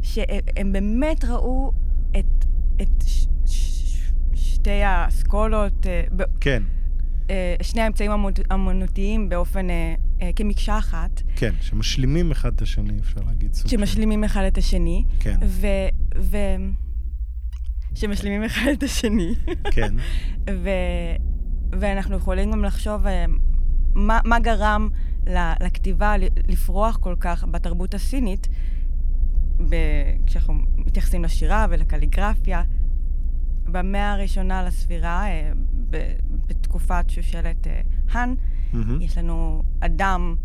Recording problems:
low rumble; faint; throughout; 20 dB below the speech

